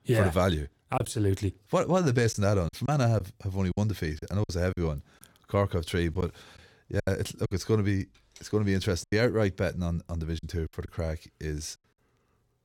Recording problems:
choppy; very; 7% of the speech affected

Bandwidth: 17.5 kHz